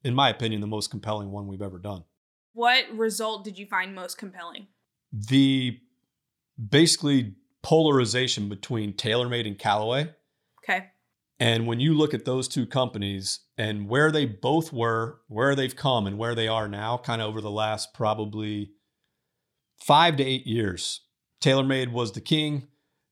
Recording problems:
none

